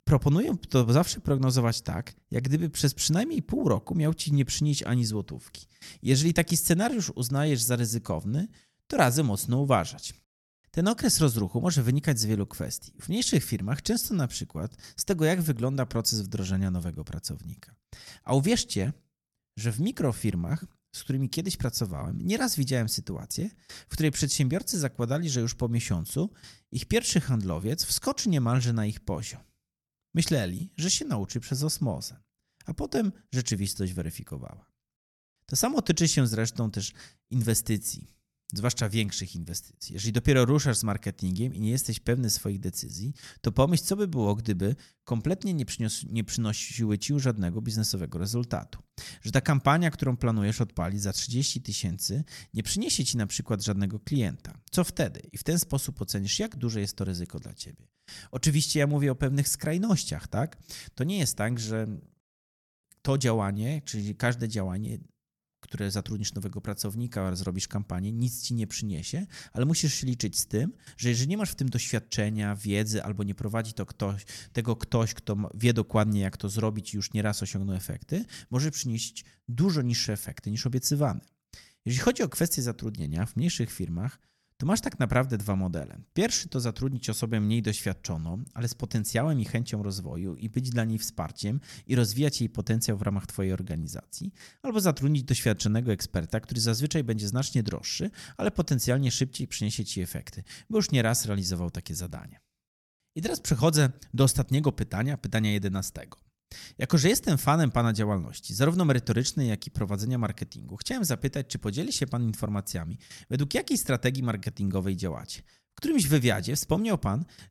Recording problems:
none

